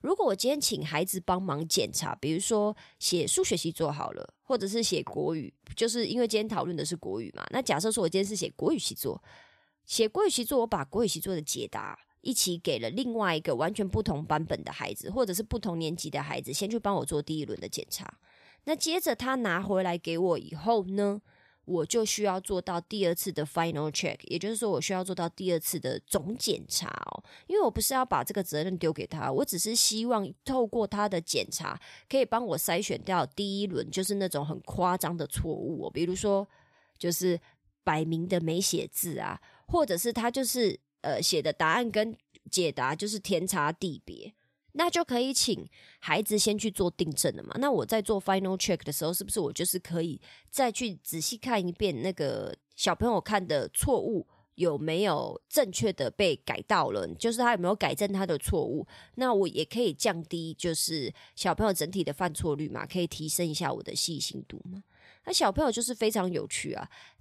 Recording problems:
none

